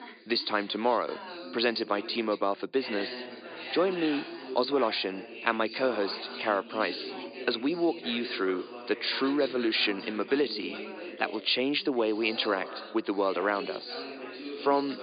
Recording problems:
high frequencies cut off; severe; nothing above 5 kHz
thin; somewhat; fading below 300 Hz
background chatter; noticeable; throughout; 4 voices, 10 dB below the speech

